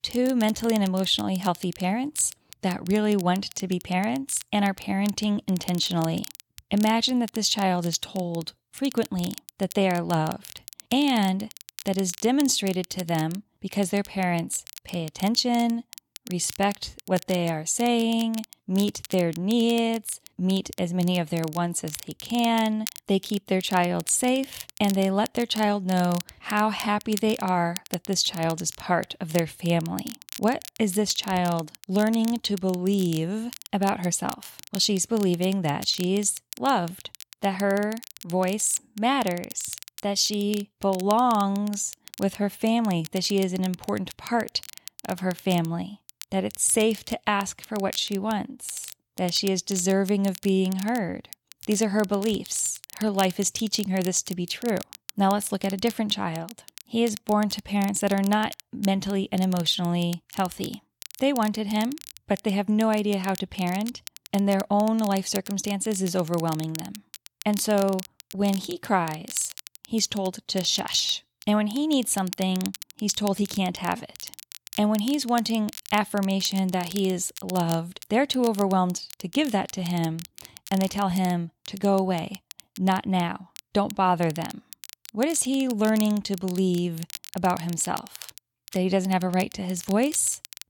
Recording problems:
crackle, like an old record; noticeable; 15 dB below the speech

